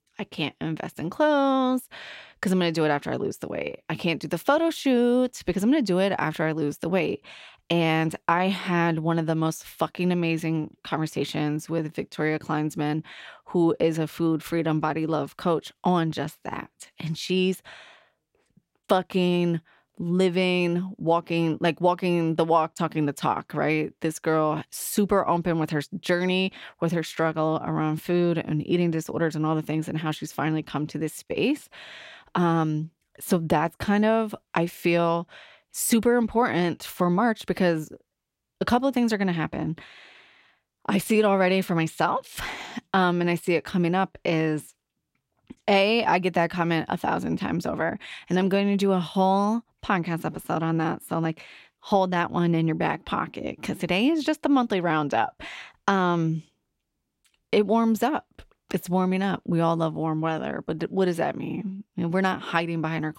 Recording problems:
none

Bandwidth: 16 kHz